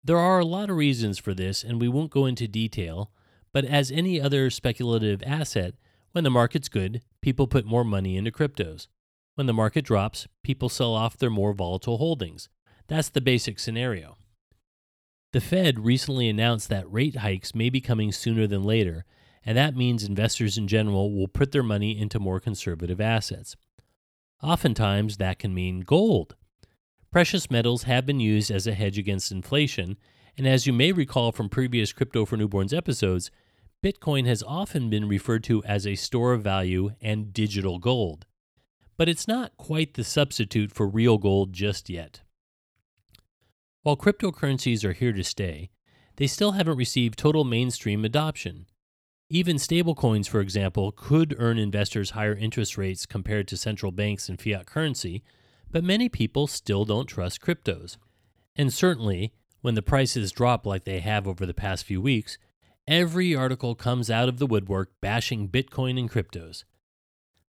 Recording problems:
none

